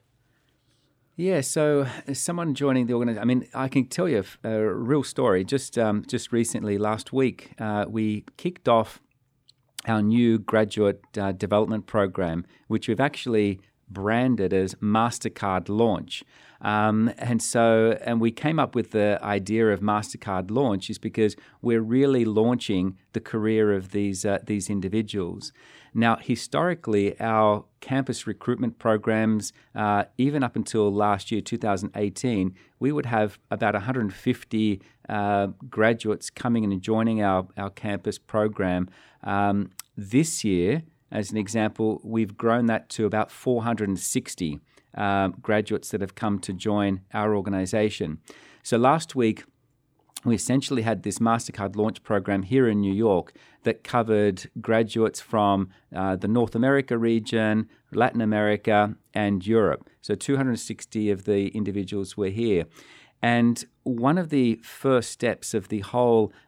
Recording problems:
none

